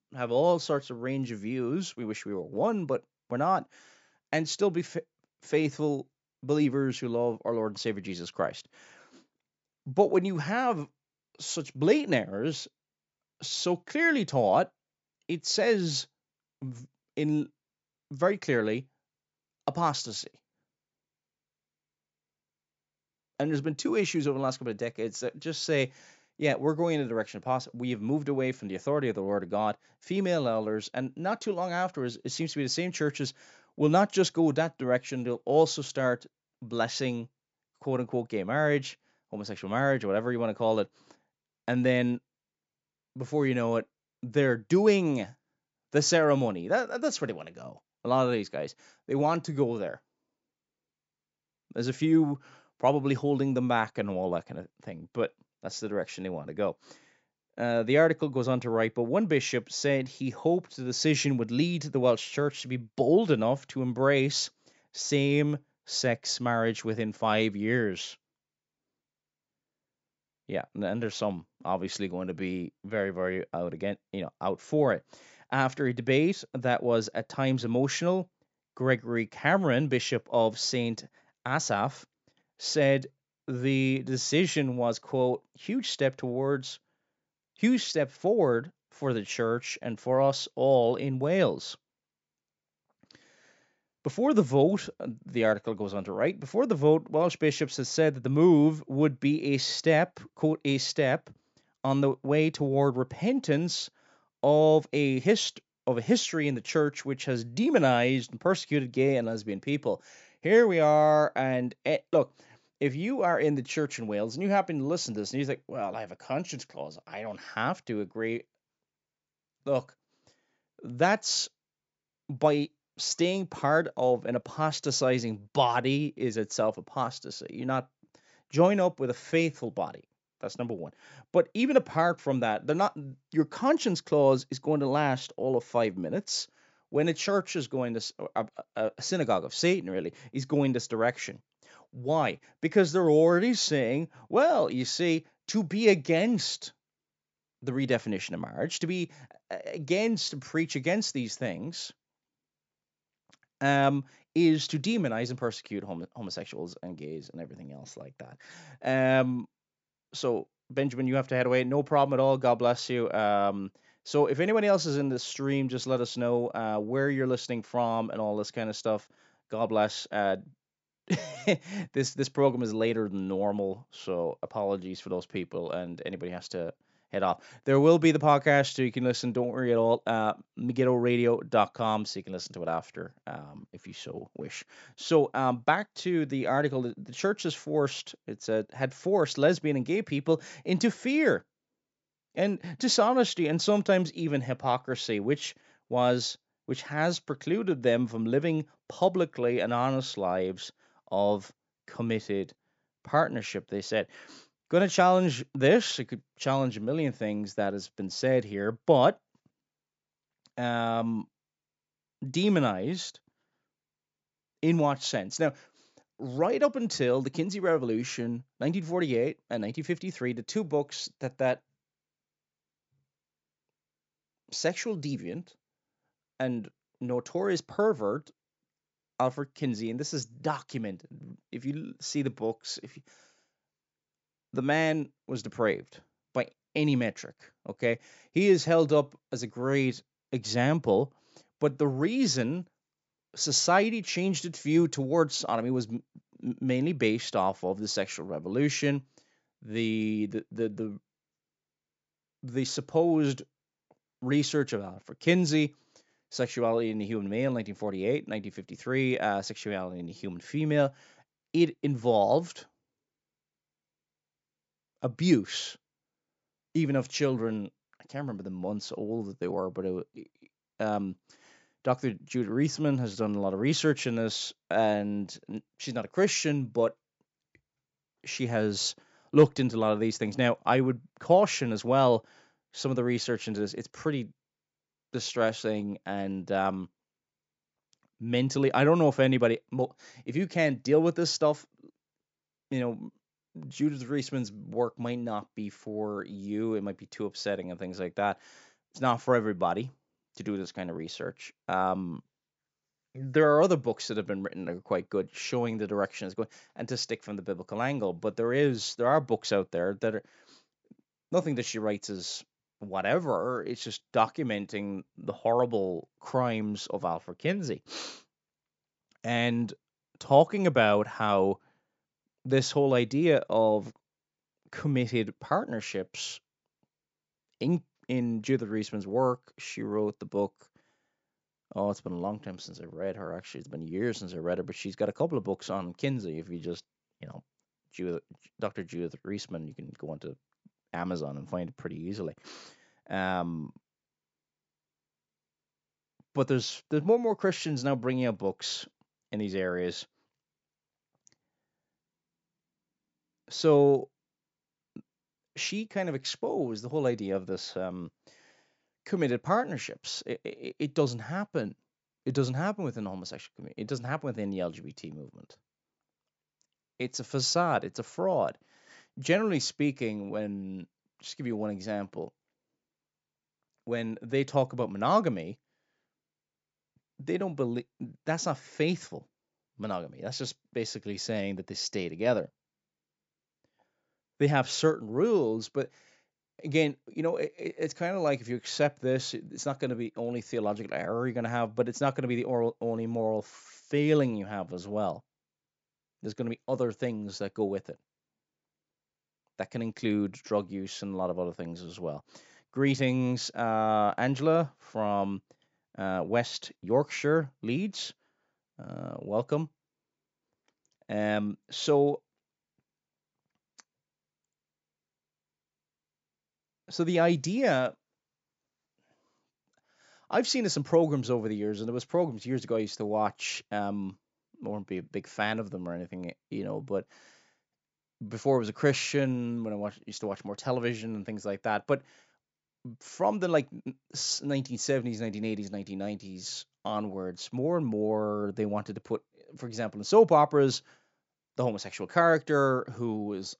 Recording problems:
high frequencies cut off; noticeable; nothing above 8 kHz

